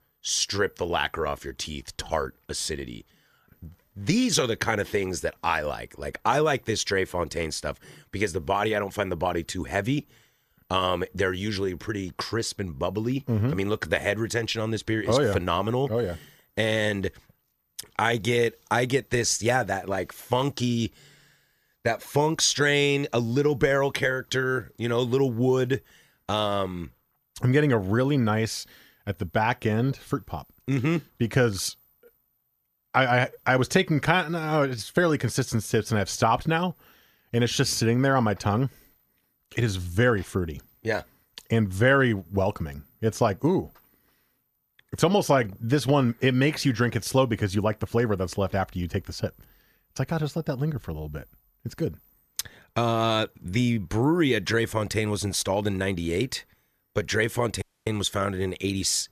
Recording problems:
audio cutting out; at 58 s

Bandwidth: 14 kHz